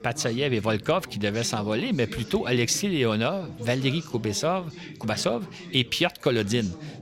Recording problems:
background chatter; noticeable; throughout; 4 voices, 15 dB below the speech

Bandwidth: 16 kHz